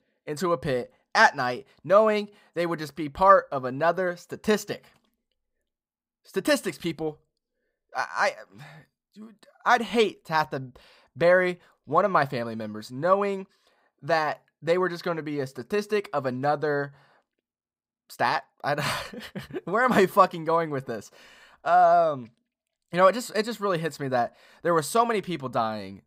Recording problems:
none

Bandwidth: 15.5 kHz